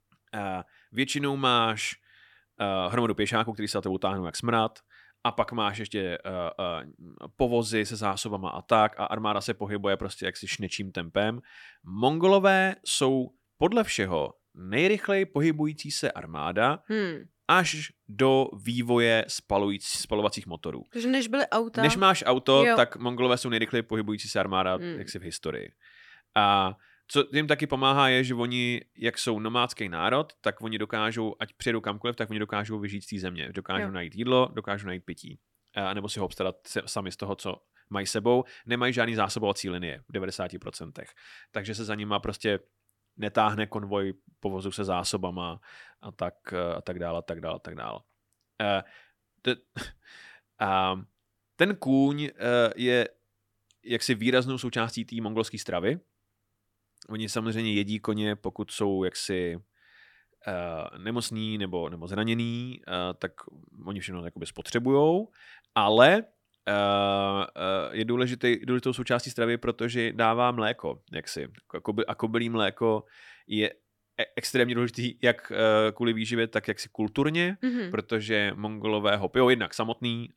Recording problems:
none

